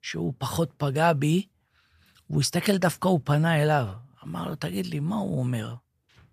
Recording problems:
none

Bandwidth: 14.5 kHz